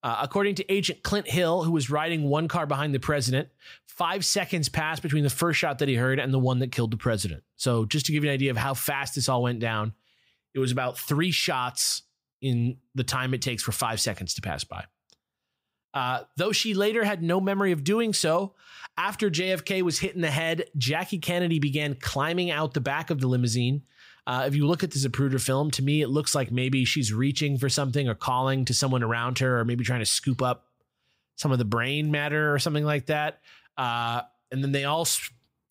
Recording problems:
none

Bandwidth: 15.5 kHz